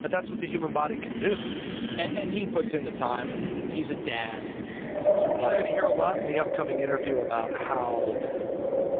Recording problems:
phone-call audio; poor line
echo of what is said; noticeable; throughout; 280 ms later, 20 dB below the speech
wind in the background; very loud; throughout; as loud as the speech

